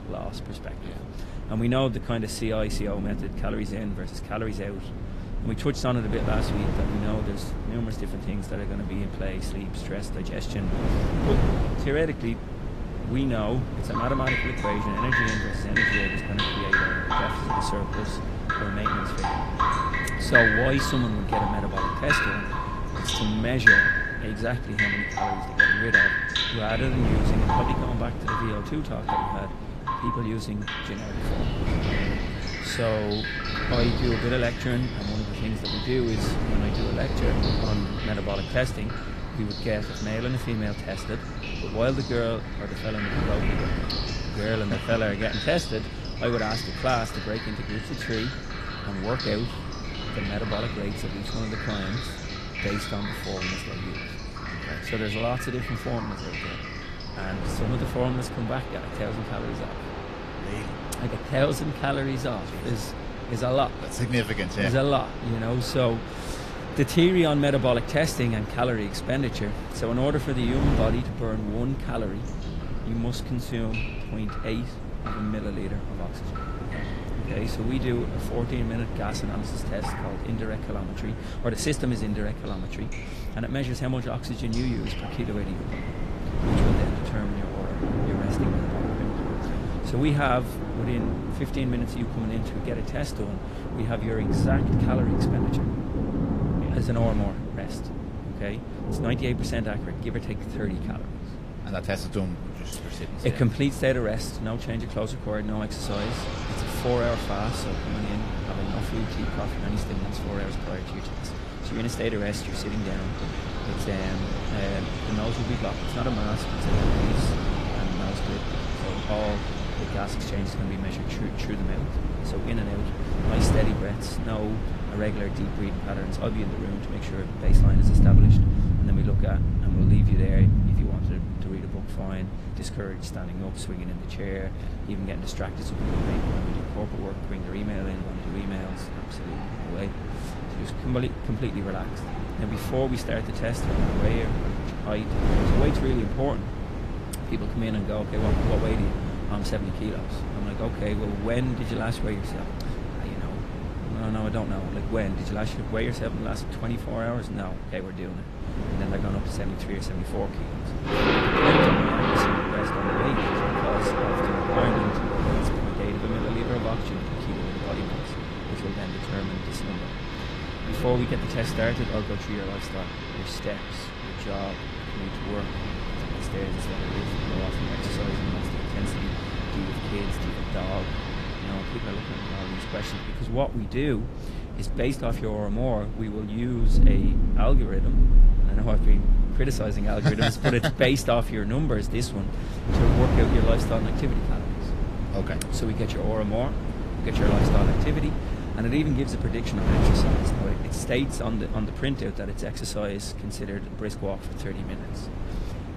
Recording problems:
garbled, watery; slightly; nothing above 14.5 kHz
rain or running water; very loud; throughout; 1 dB above the speech
wind noise on the microphone; heavy; 6 dB below the speech

